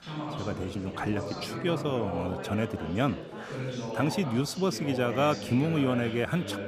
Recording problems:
background chatter; loud; throughout; 4 voices, 7 dB below the speech

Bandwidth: 14.5 kHz